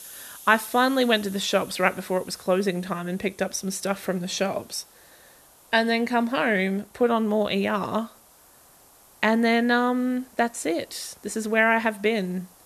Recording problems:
hiss; faint; throughout; 25 dB below the speech

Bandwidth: 13.5 kHz